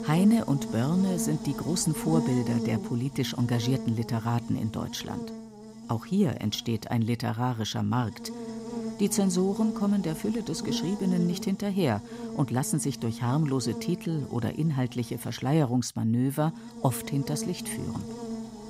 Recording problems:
electrical hum; loud; throughout; 60 Hz, 8 dB below the speech

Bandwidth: 15.5 kHz